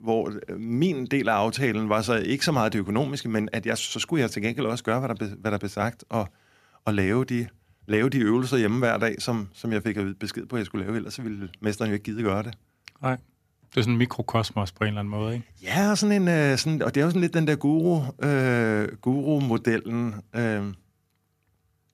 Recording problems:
none

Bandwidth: 14.5 kHz